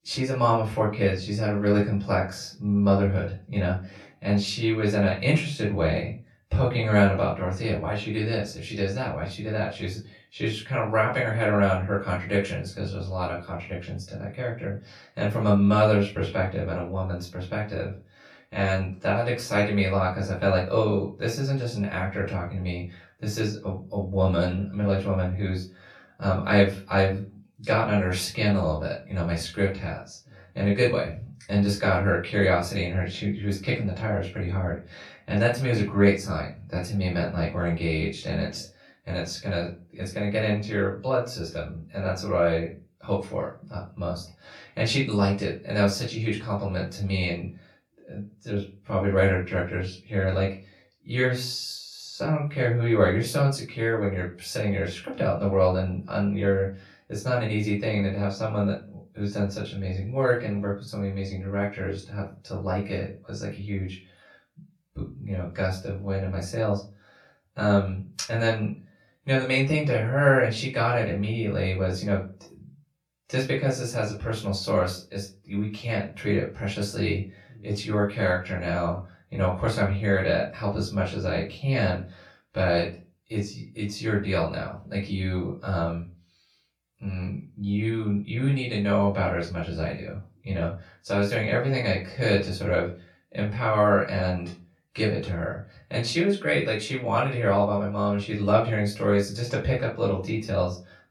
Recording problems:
off-mic speech; far
room echo; slight; dies away in 0.3 s

